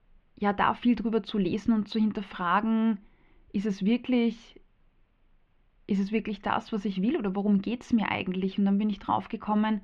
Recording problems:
muffled; very; fading above 3 kHz

